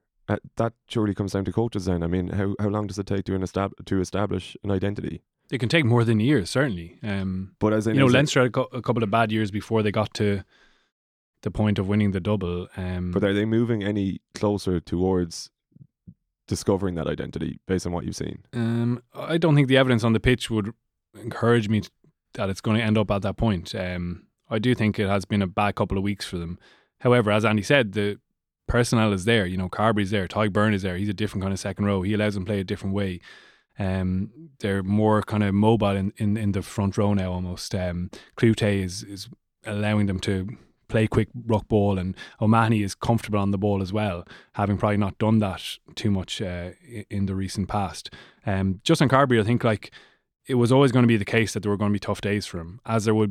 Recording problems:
abrupt cut into speech; at the end

